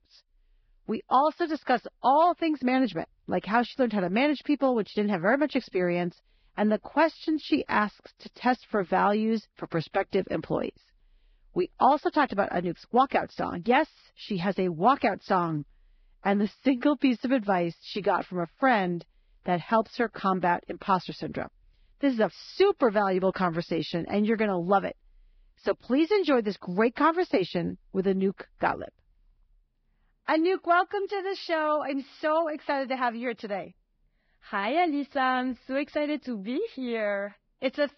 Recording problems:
garbled, watery; badly; nothing above 5.5 kHz

